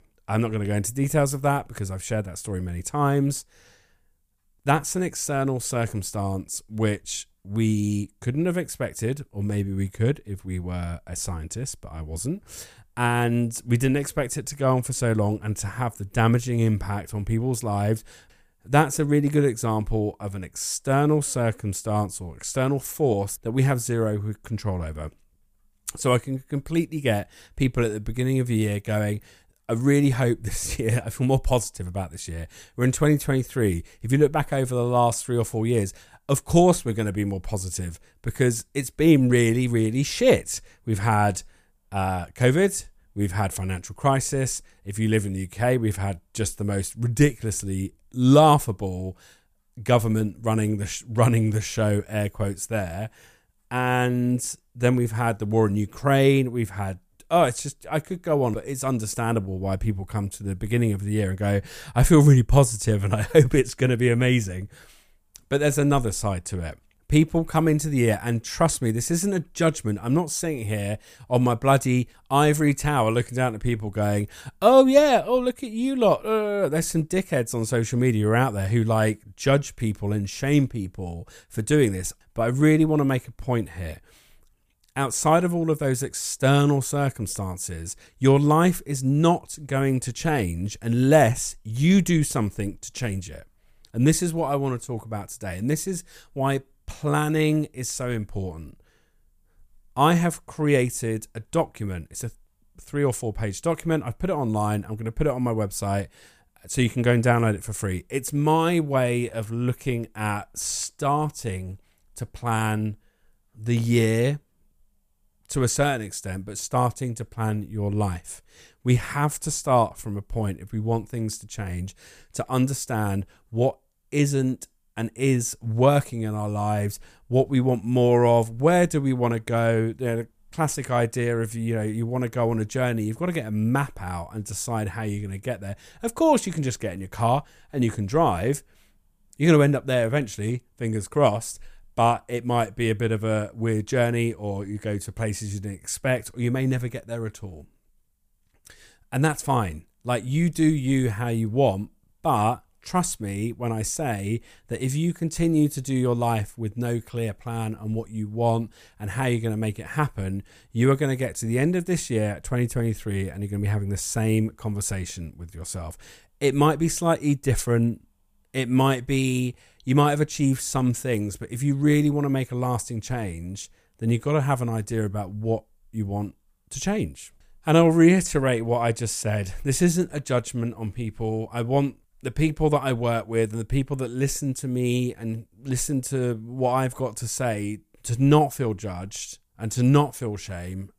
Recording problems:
none

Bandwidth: 15 kHz